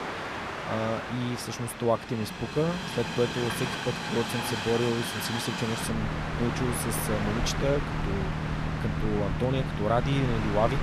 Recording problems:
train or aircraft noise; loud; throughout; 2 dB below the speech

